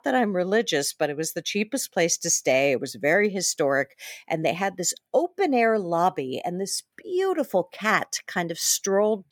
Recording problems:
none

